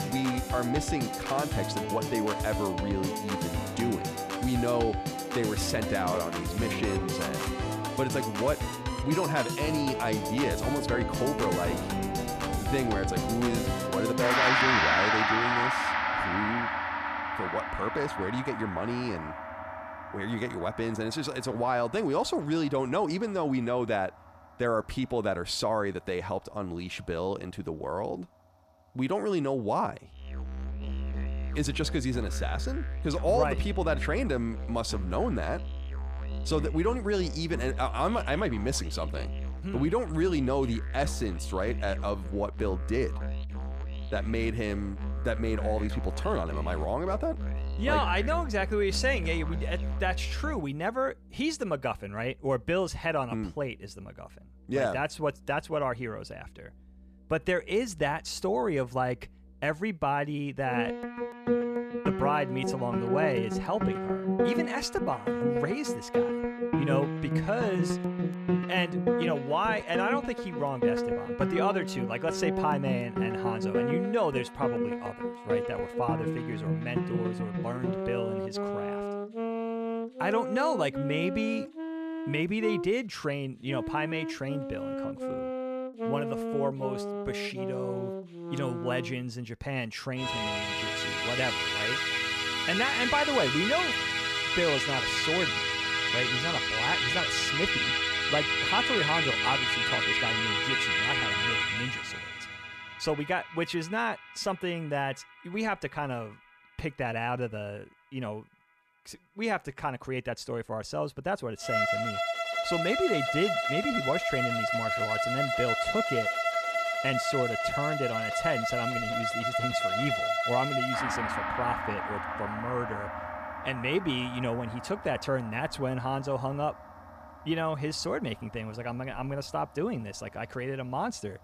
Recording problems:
background music; very loud; throughout; 1 dB above the speech

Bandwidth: 14.5 kHz